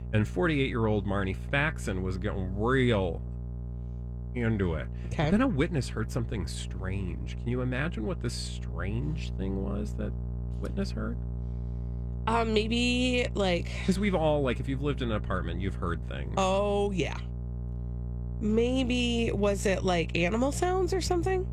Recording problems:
electrical hum; noticeable; throughout; 60 Hz, 20 dB below the speech

